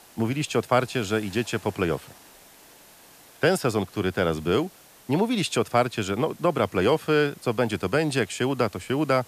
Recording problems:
hiss; faint; throughout; 25 dB below the speech

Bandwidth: 14.5 kHz